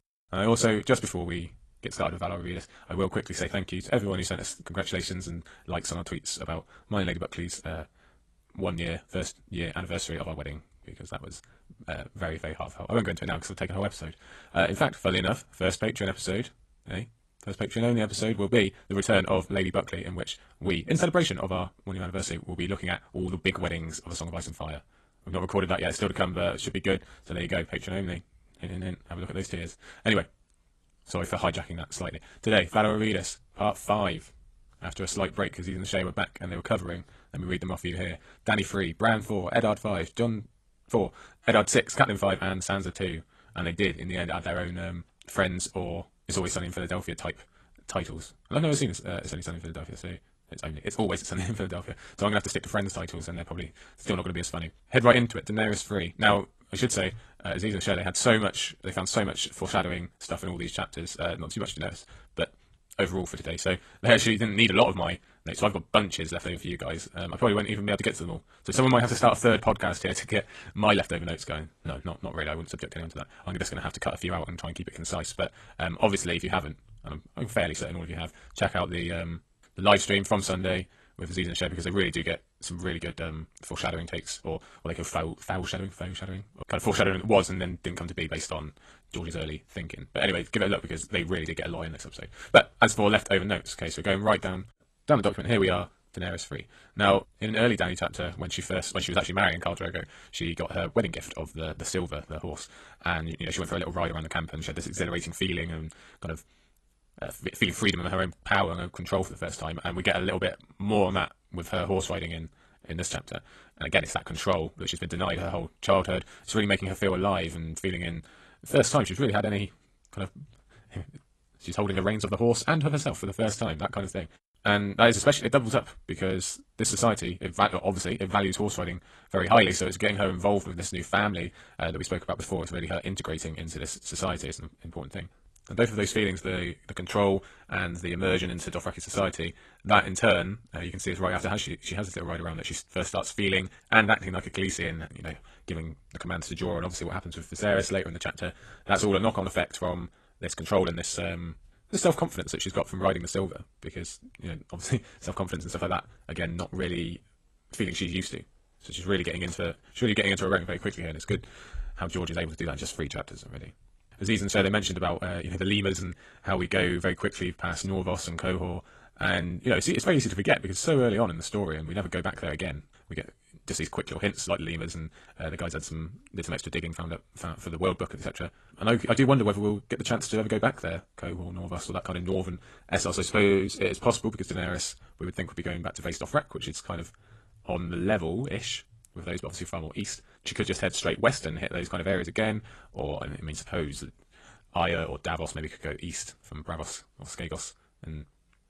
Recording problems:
wrong speed, natural pitch; too fast; 1.5 times normal speed
garbled, watery; slightly; nothing above 12 kHz

